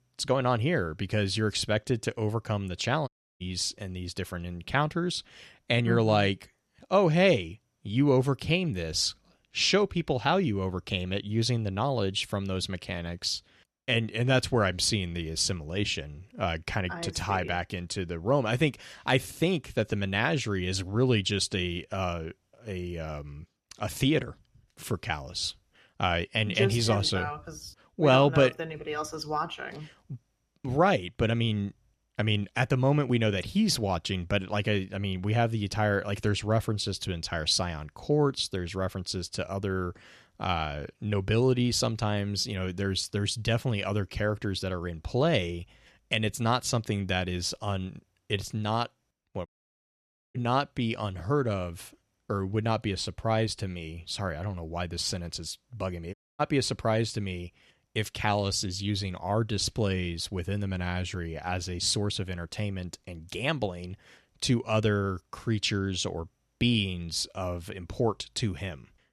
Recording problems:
audio cutting out; at 3 s, at 49 s for 1 s and at 56 s

